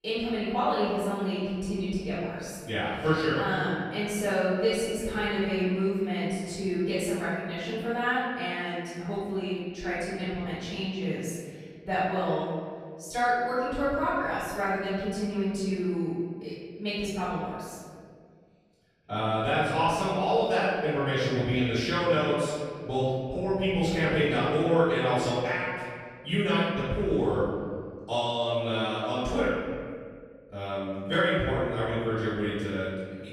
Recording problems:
room echo; strong; dies away in 1.9 s
off-mic speech; far

